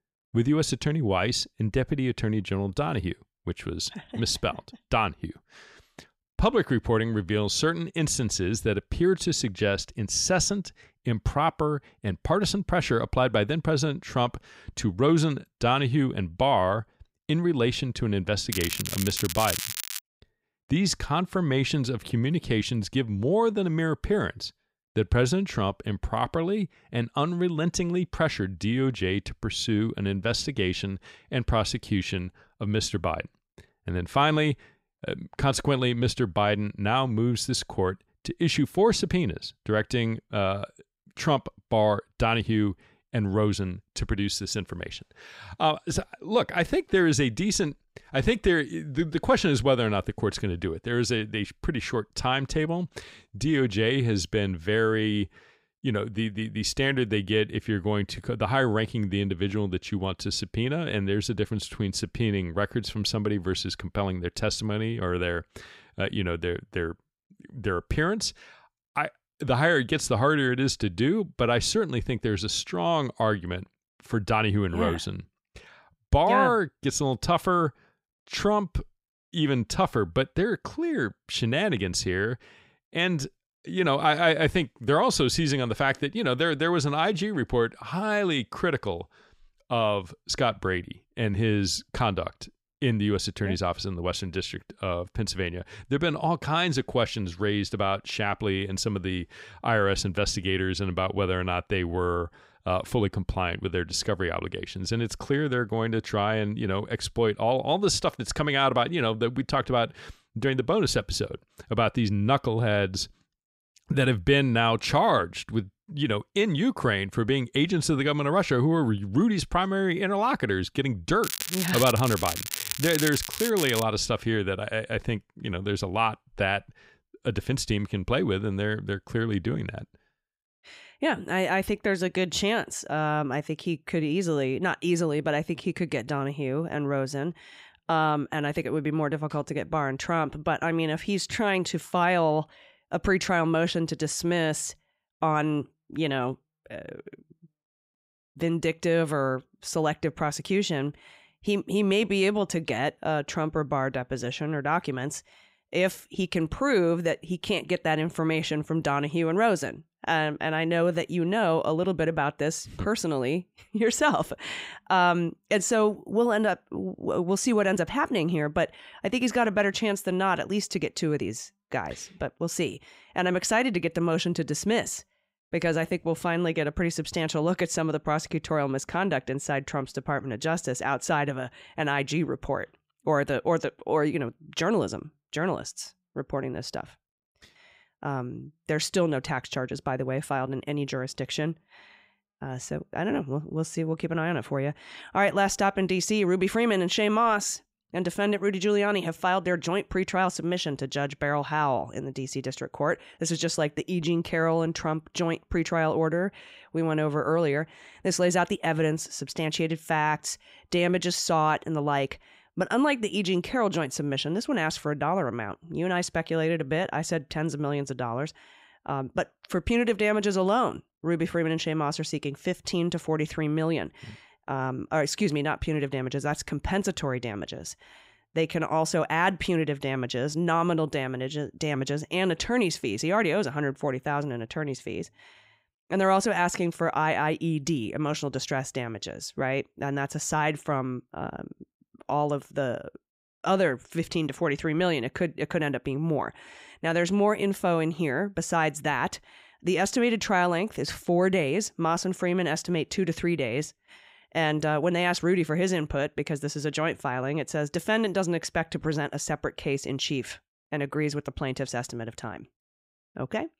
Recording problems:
crackling; loud; from 19 to 20 s and from 2:01 to 2:04; 4 dB below the speech

